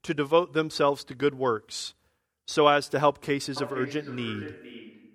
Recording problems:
echo of what is said; noticeable; from 3.5 s on; 460 ms later, 15 dB below the speech

